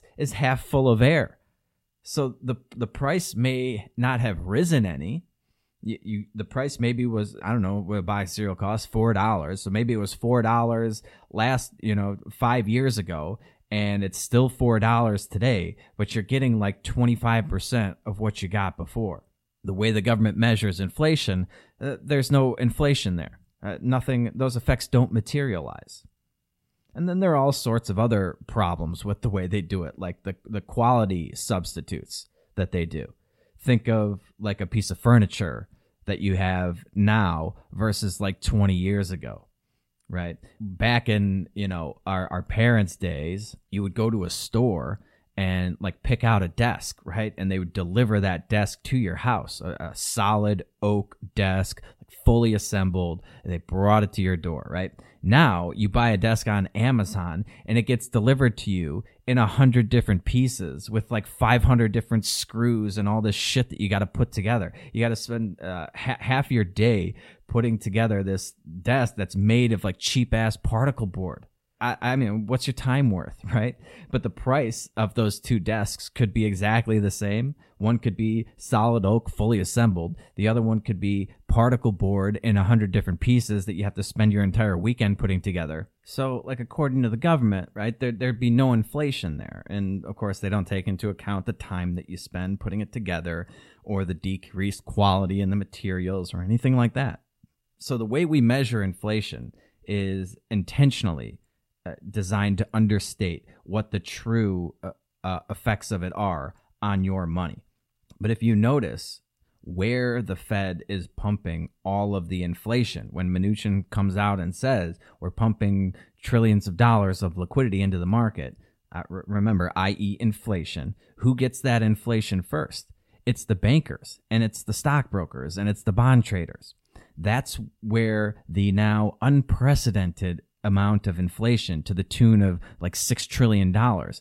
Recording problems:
none

